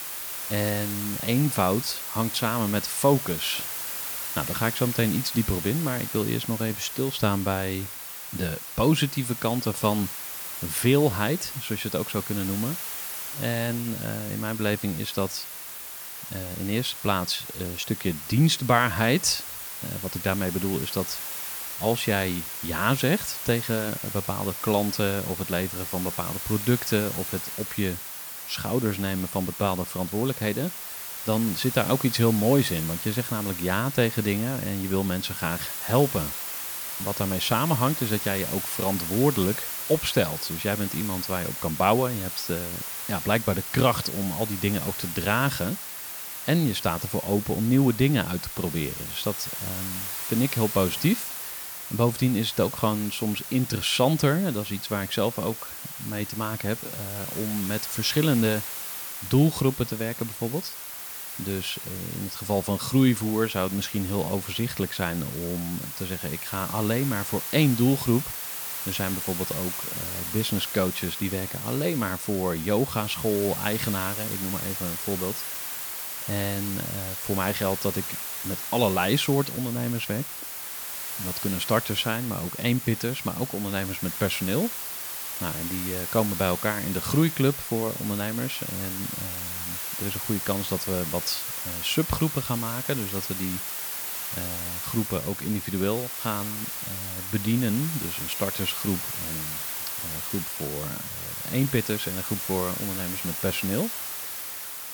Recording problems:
hiss; loud; throughout; 4 dB below the speech

